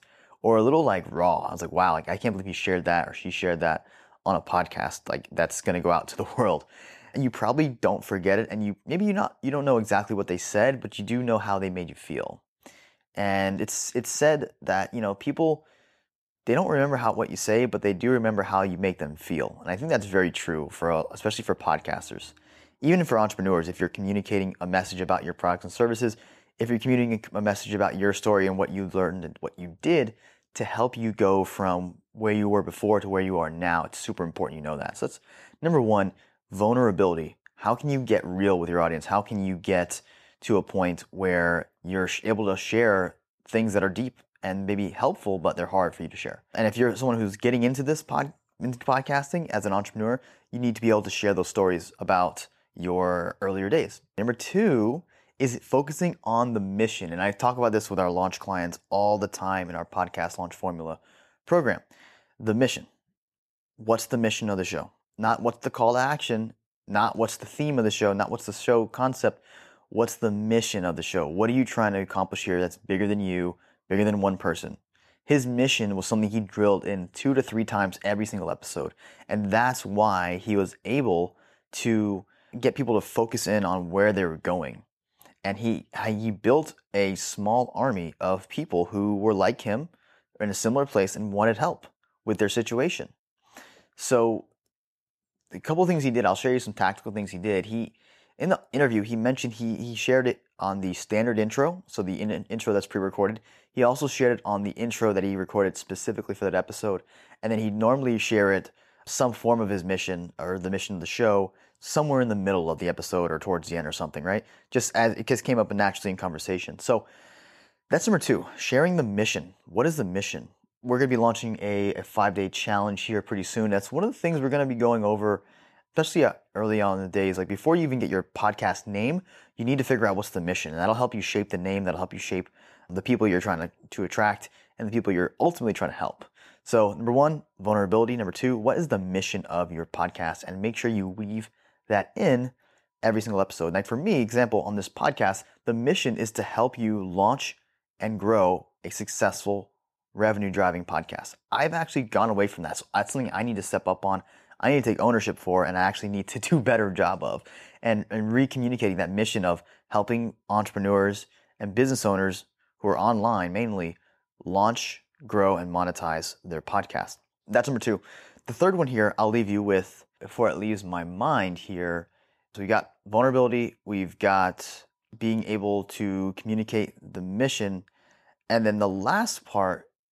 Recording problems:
none

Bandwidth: 14 kHz